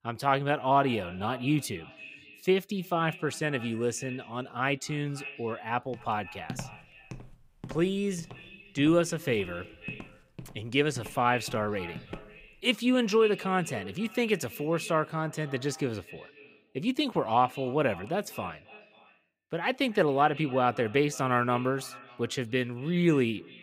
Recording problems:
echo of what is said; noticeable; throughout; 270 ms later, 15 dB below the speech
footsteps; faint; from 6 to 12 s; peak 10 dB below the speech

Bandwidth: 15.5 kHz